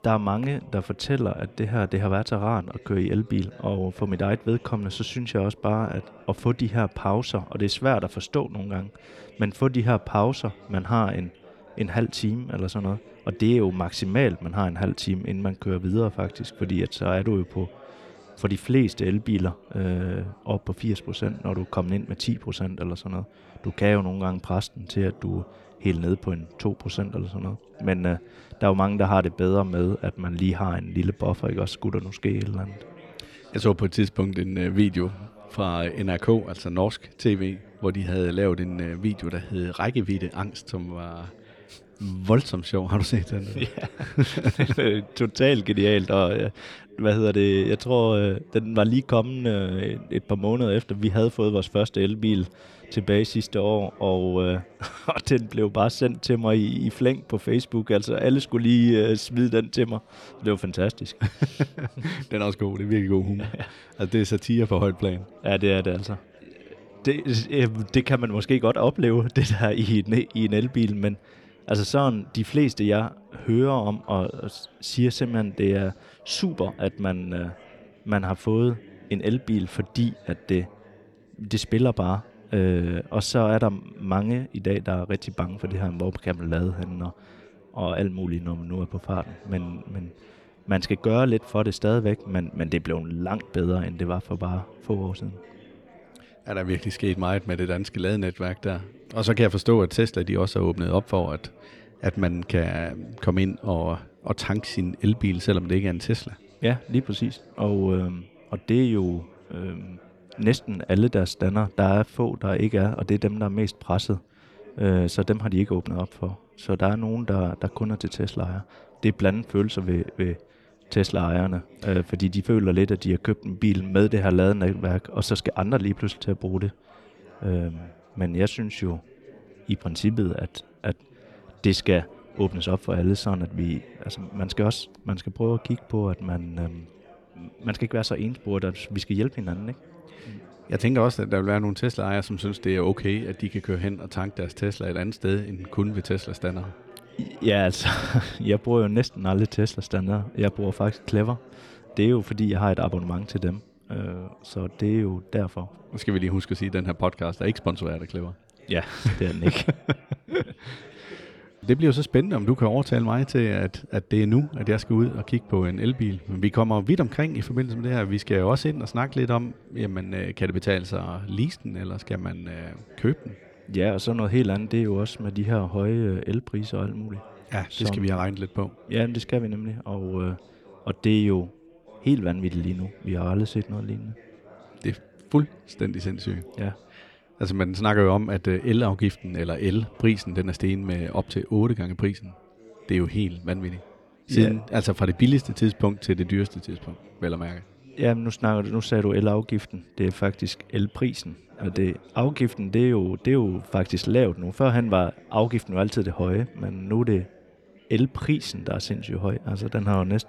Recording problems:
background chatter; faint; throughout; 4 voices, 25 dB below the speech

